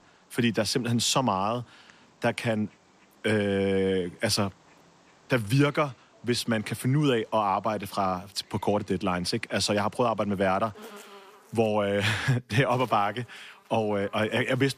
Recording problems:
animal sounds; faint; throughout; 25 dB below the speech

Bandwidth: 14.5 kHz